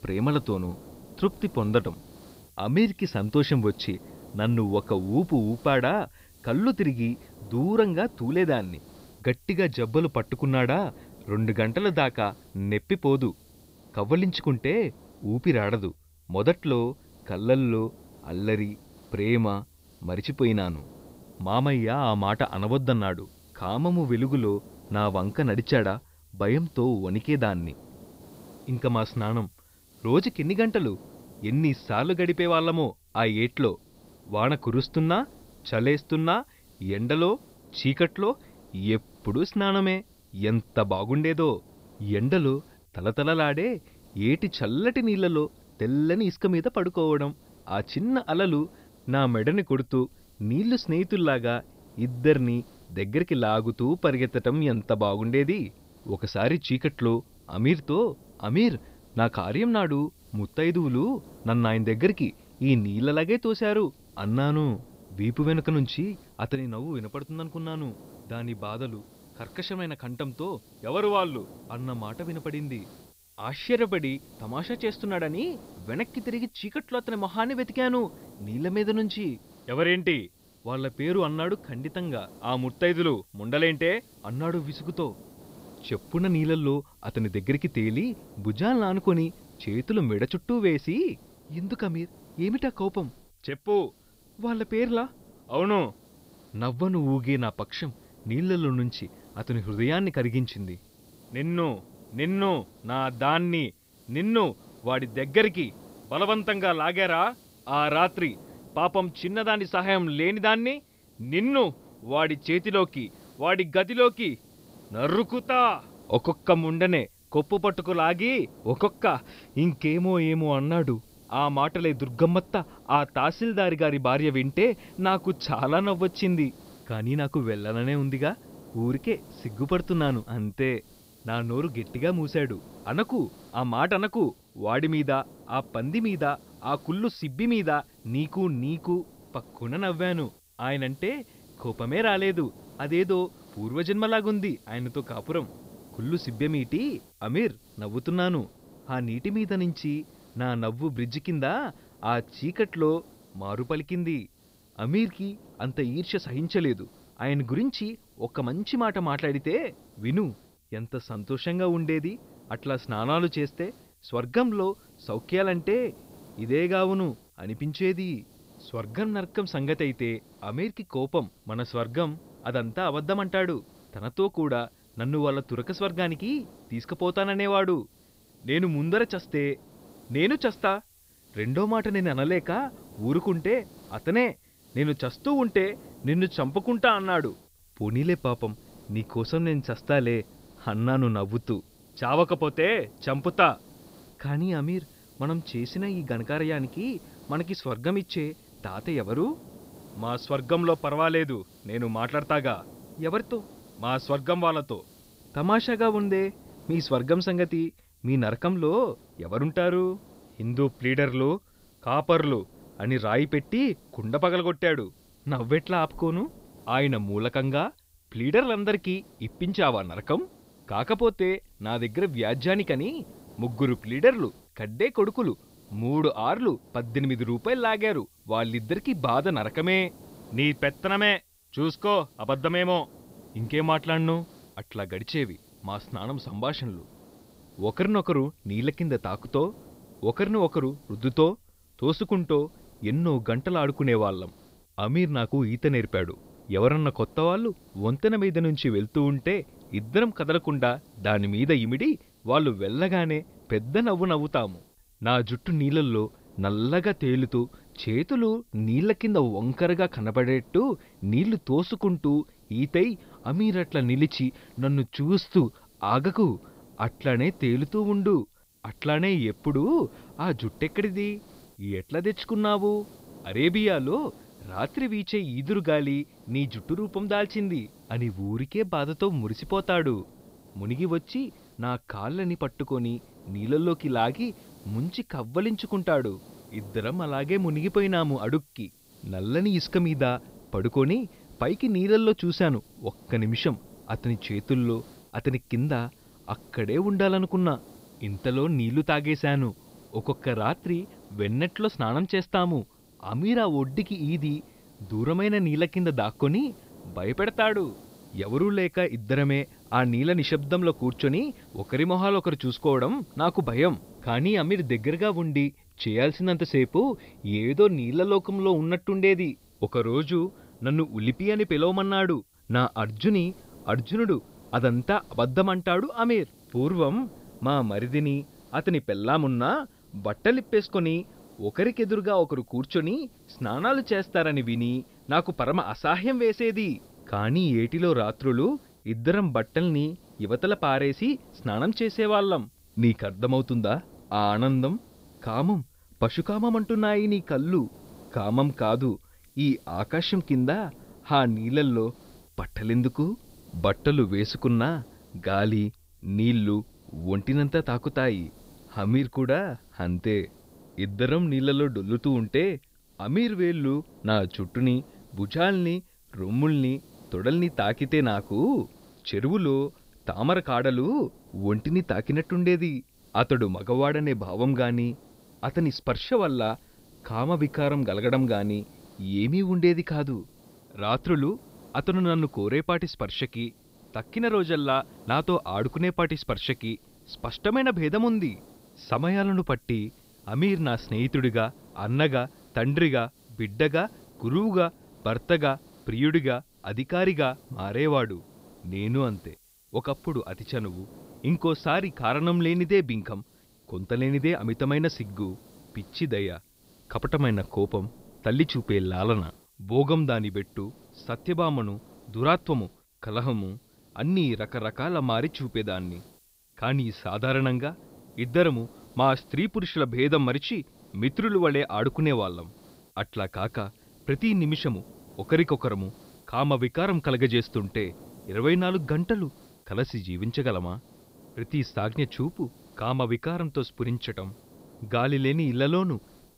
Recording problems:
high frequencies cut off; noticeable; nothing above 5.5 kHz
hiss; faint; throughout; 25 dB below the speech

